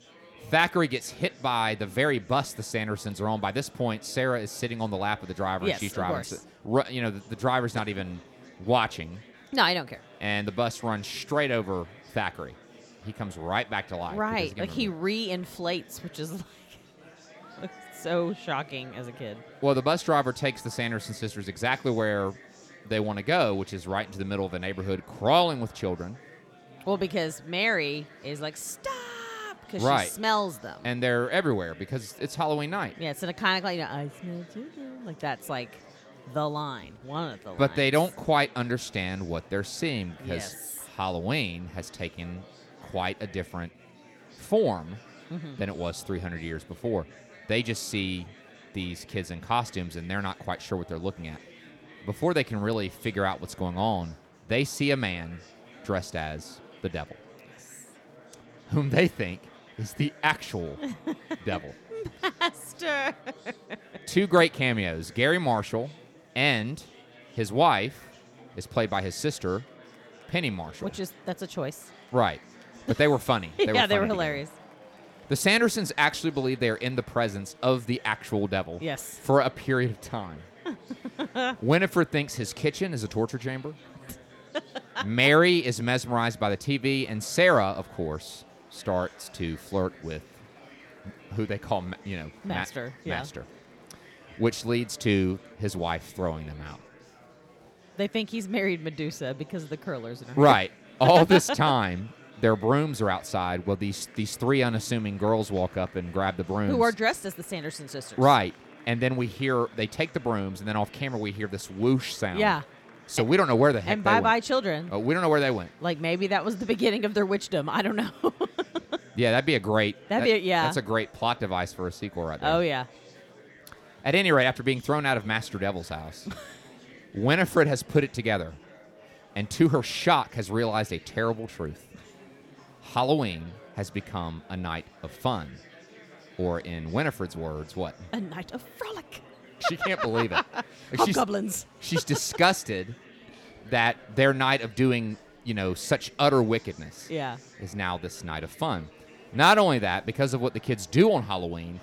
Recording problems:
chatter from many people; faint; throughout; 25 dB below the speech

